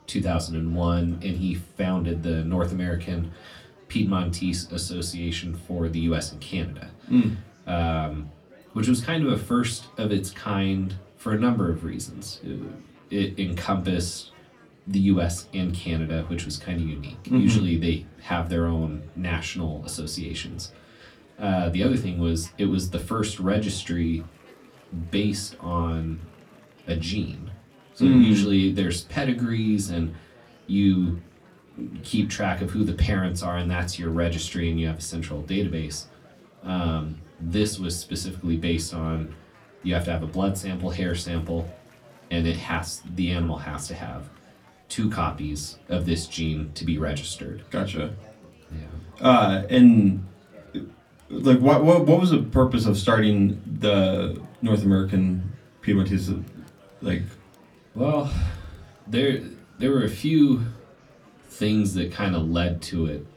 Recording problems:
off-mic speech; far
room echo; very slight; dies away in 0.2 s
murmuring crowd; faint; throughout; 30 dB below the speech

